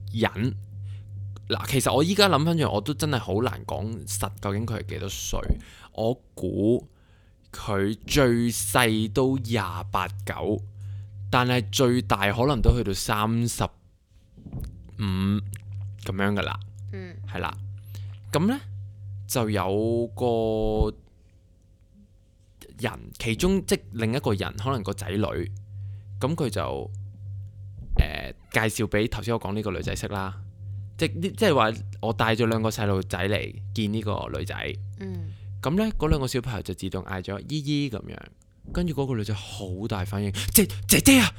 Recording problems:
low rumble; faint; throughout; 25 dB below the speech

